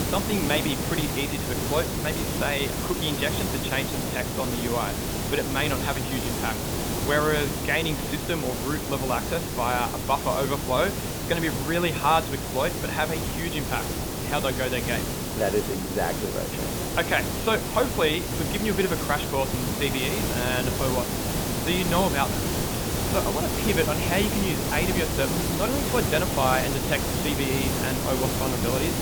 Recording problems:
high frequencies cut off; severe; nothing above 4 kHz
hiss; loud; throughout; as loud as the speech

